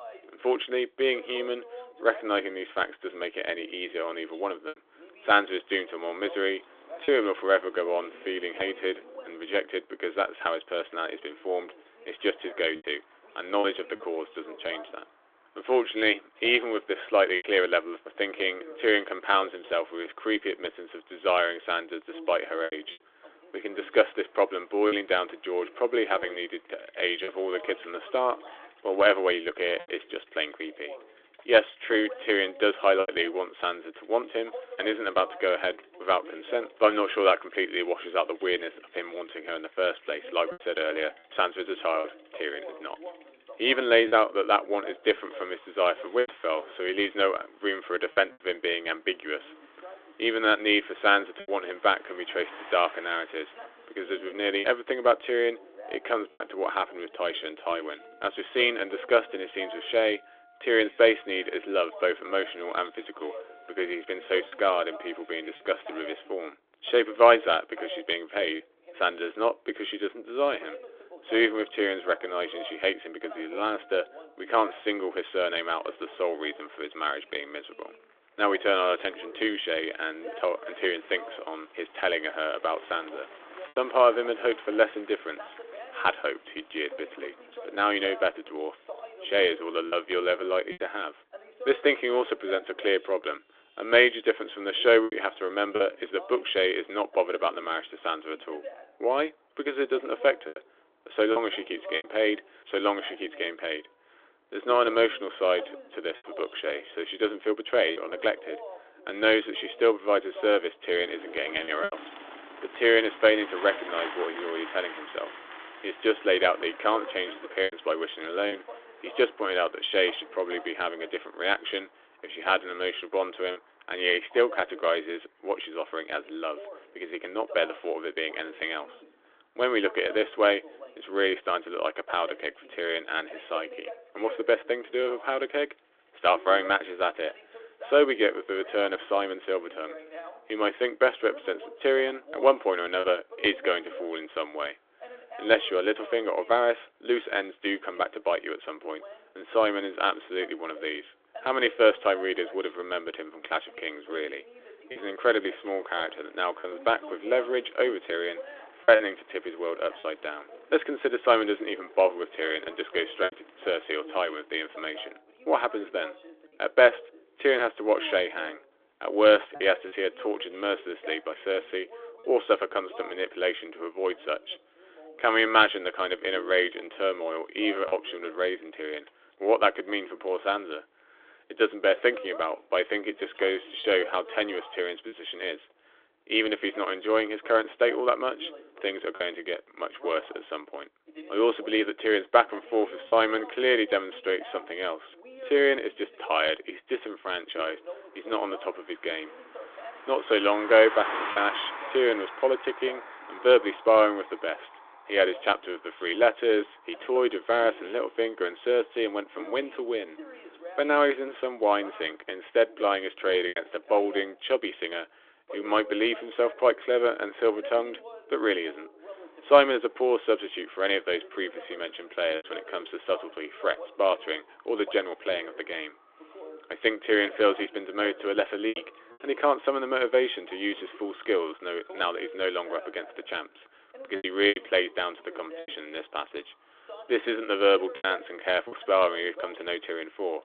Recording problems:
phone-call audio; nothing above 3.5 kHz
voice in the background; noticeable; throughout; 20 dB below the speech
traffic noise; faint; throughout; 20 dB below the speech
choppy; occasionally; 2% of the speech affected

